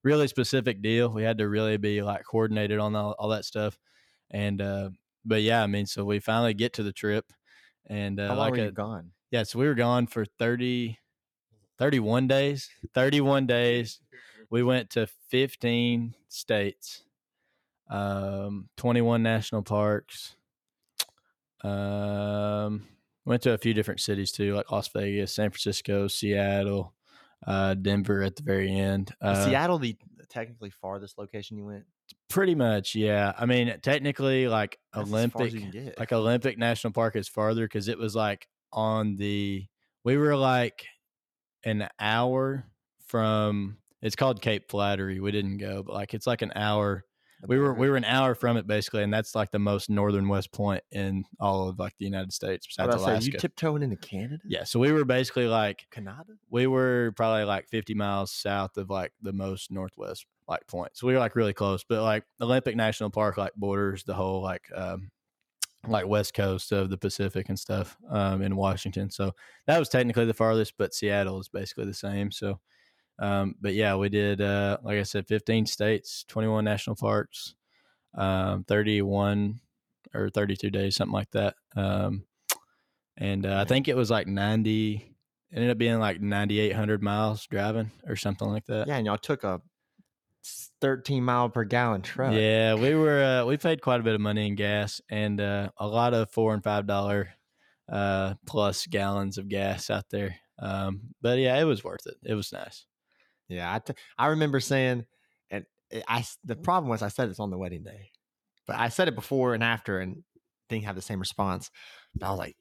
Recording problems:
none

